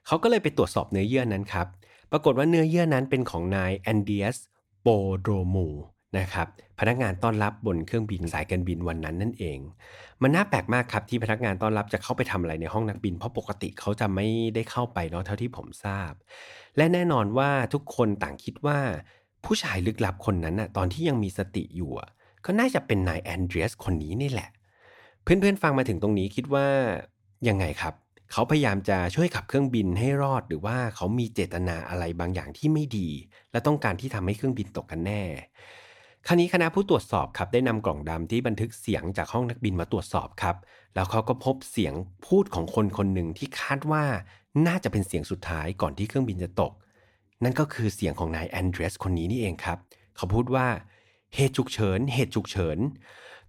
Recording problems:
none

